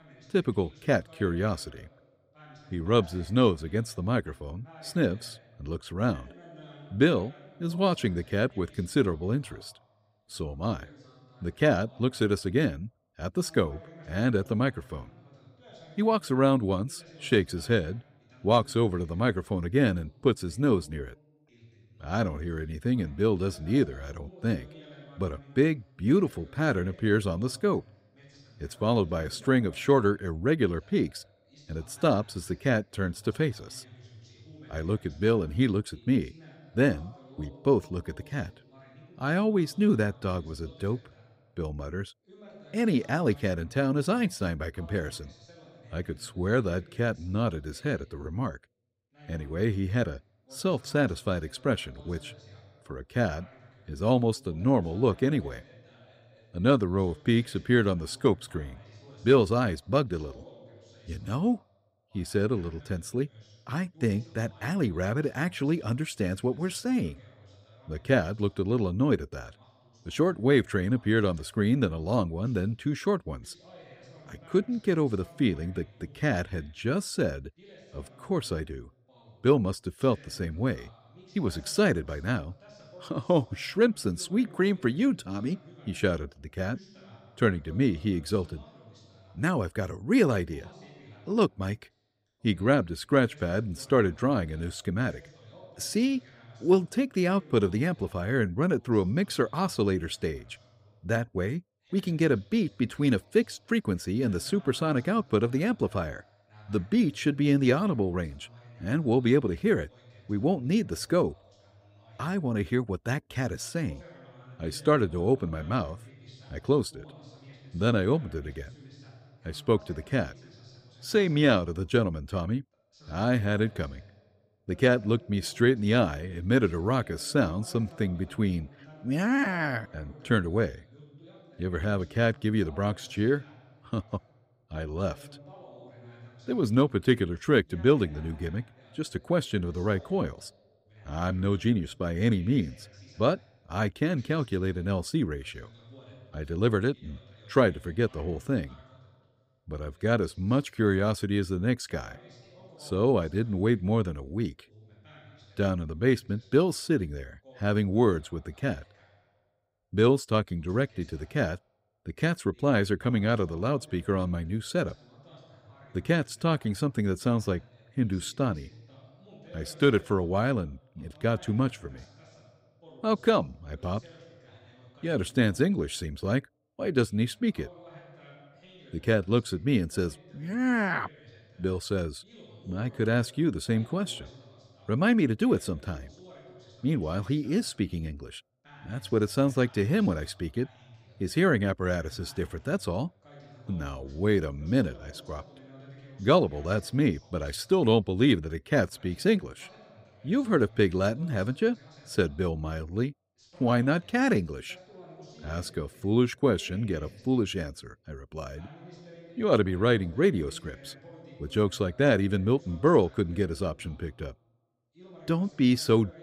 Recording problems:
voice in the background; faint; throughout; 25 dB below the speech

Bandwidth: 15.5 kHz